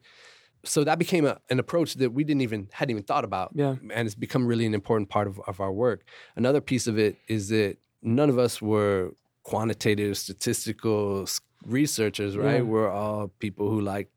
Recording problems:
none

